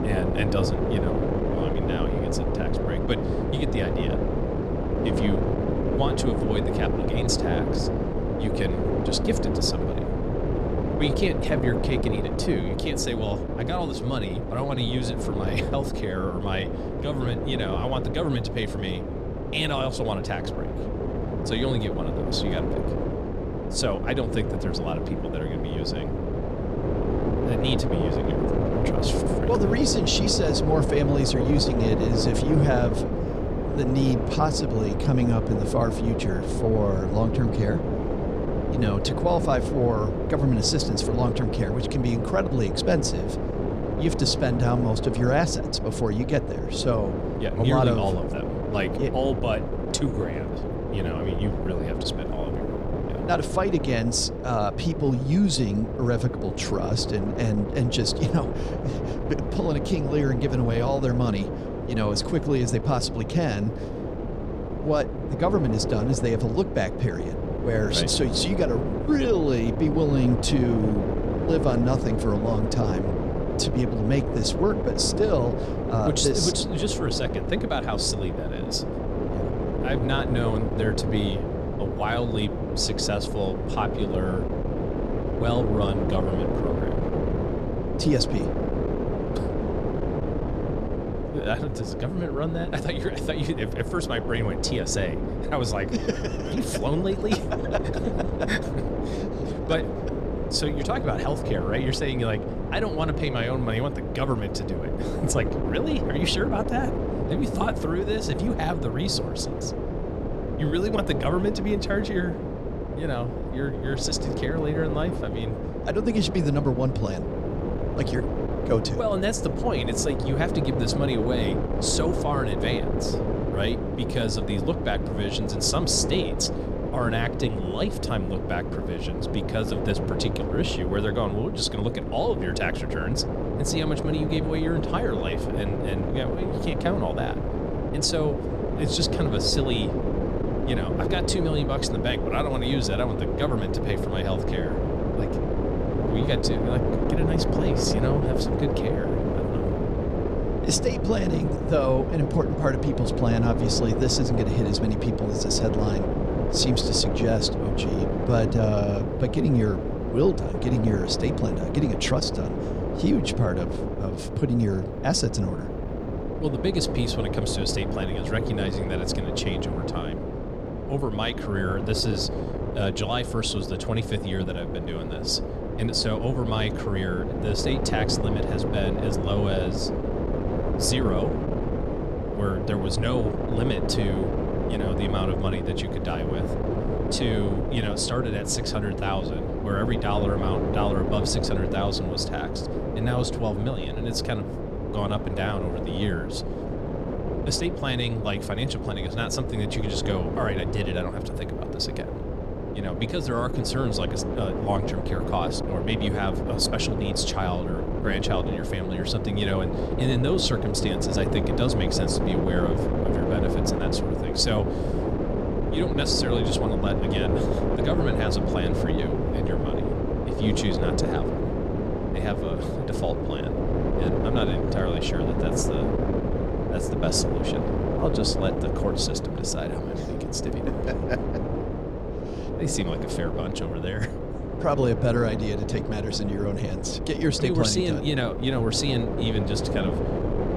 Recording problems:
wind noise on the microphone; heavy; 2 dB below the speech

